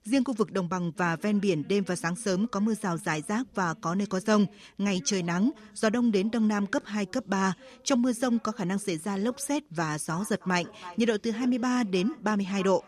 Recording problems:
echo of what is said; faint; from 10 s on; 320 ms later, 20 dB below the speech
voice in the background; faint; throughout; 25 dB below the speech

